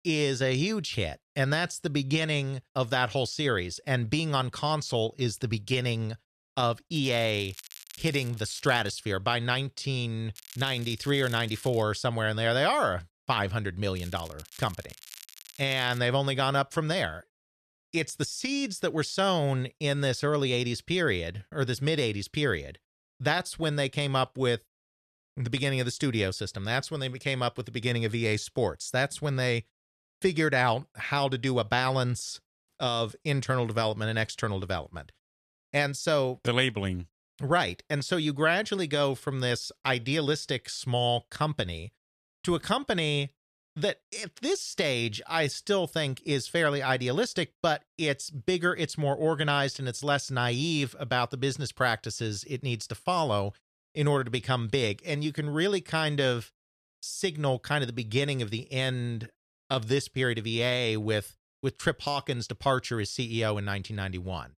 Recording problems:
crackling; noticeable; from 7 to 9 s, from 10 to 12 s and from 14 to 16 s; 20 dB below the speech

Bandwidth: 14 kHz